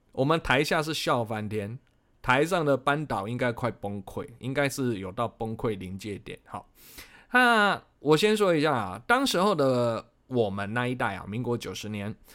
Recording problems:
none

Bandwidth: 16 kHz